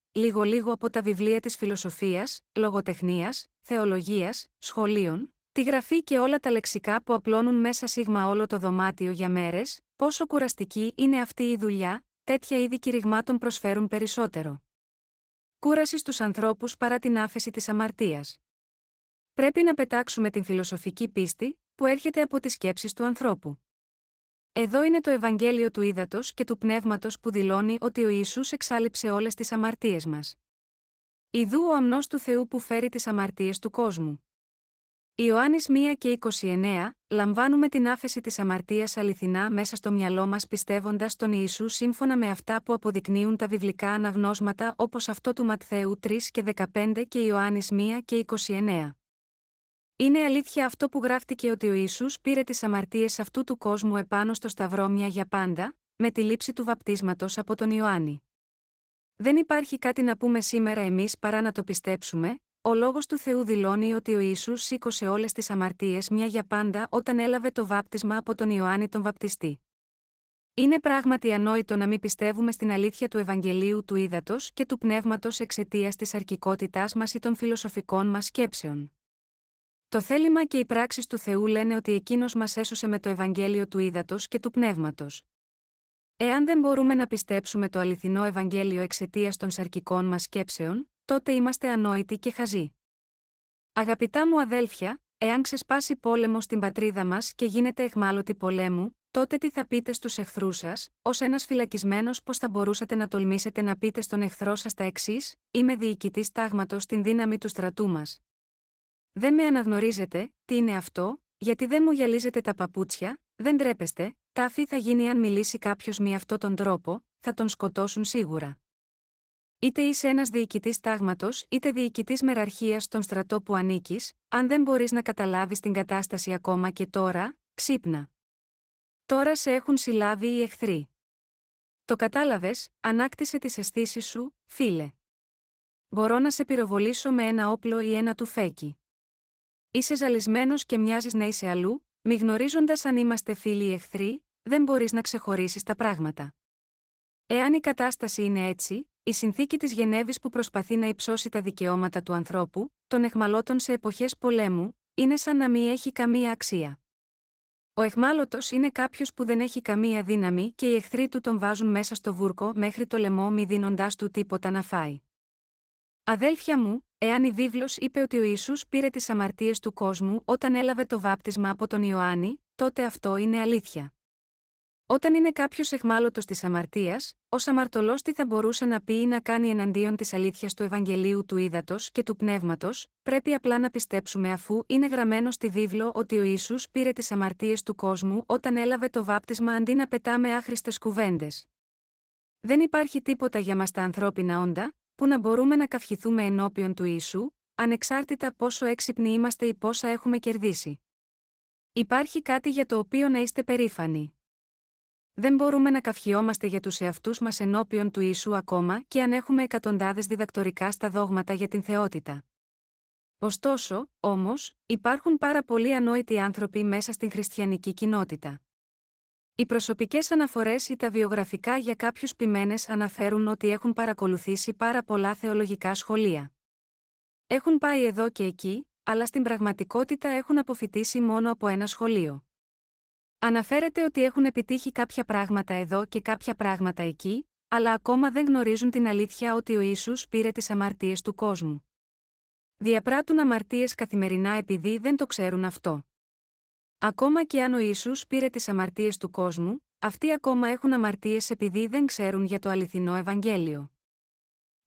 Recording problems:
garbled, watery; slightly; nothing above 16 kHz

